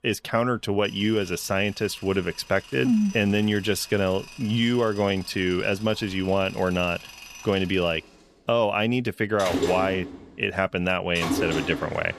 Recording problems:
machinery noise; noticeable; throughout; 10 dB below the speech

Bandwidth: 13.5 kHz